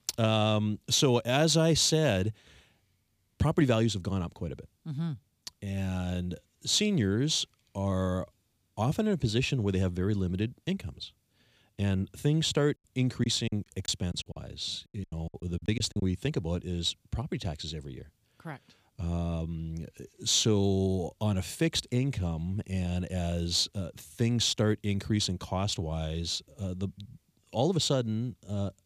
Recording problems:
choppy; very; from 13 to 16 s; 16% of the speech affected

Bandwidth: 15 kHz